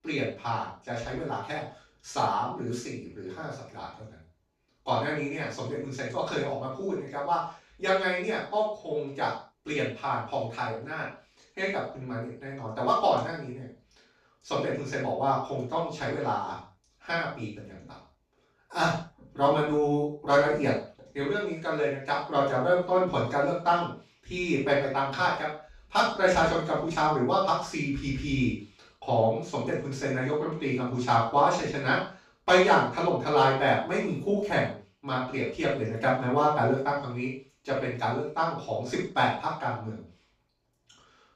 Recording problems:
off-mic speech; far
room echo; noticeable; dies away in 0.4 s

